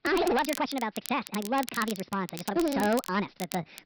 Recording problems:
wrong speed and pitch; too fast and too high; 1.5 times normal speed
high frequencies cut off; noticeable; nothing above 5.5 kHz
distortion; slight; 8% of the sound clipped
crackle, like an old record; noticeable; 10 dB below the speech
uneven, jittery; strongly

